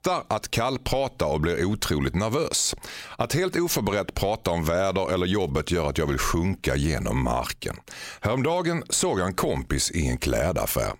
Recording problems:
squashed, flat; somewhat

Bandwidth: 16 kHz